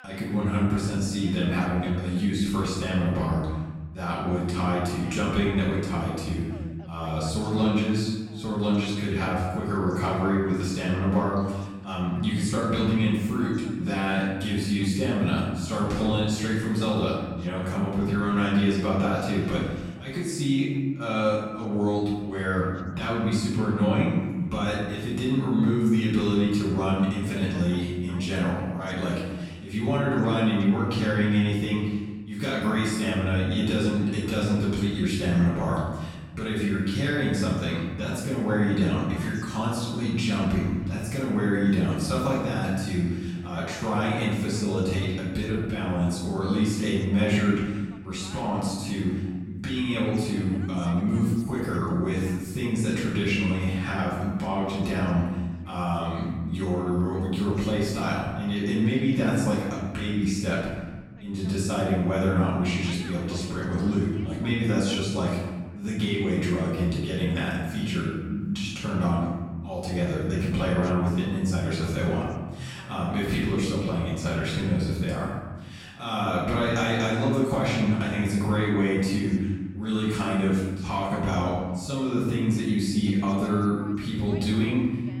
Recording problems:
off-mic speech; far
room echo; noticeable; dies away in 1.2 s
voice in the background; faint; throughout; 25 dB below the speech

